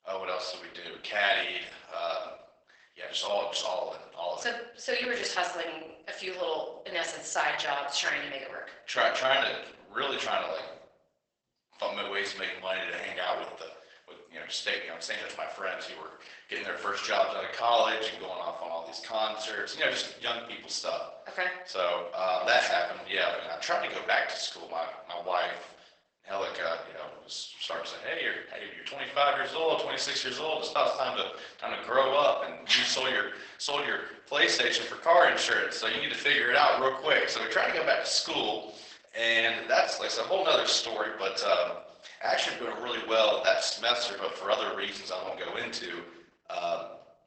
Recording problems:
garbled, watery; badly; nothing above 8 kHz
thin; very; fading below 650 Hz
room echo; slight; dies away in 0.6 s
off-mic speech; somewhat distant

